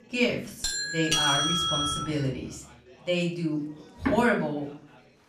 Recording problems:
off-mic speech; far
room echo; slight; dies away in 0.4 s
background music; faint; throughout; 20 dB below the speech
chatter from many people; faint; throughout; 25 dB below the speech
doorbell; loud; from 0.5 to 2 s; peak 6 dB above the speech
door banging; noticeable; at 4 s; peak 2 dB below the speech

